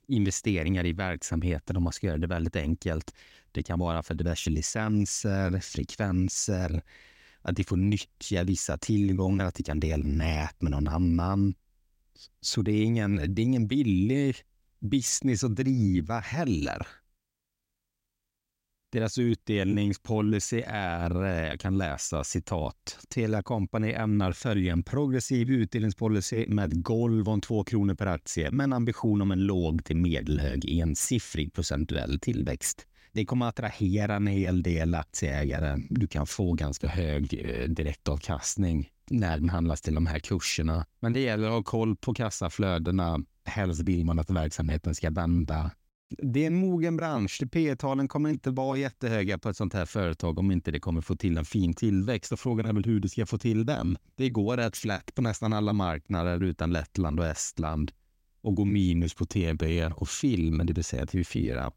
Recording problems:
none

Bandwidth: 16 kHz